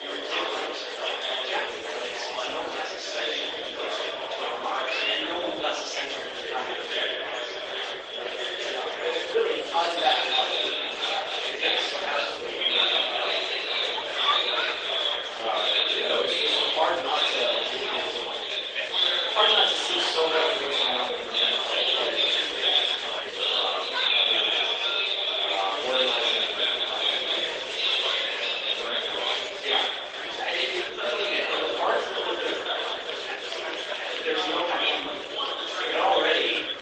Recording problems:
off-mic speech; far
thin; very; fading below 400 Hz
room echo; noticeable; dies away in 0.6 s
garbled, watery; slightly; nothing above 8.5 kHz
murmuring crowd; very loud; throughout; 4 dB above the speech

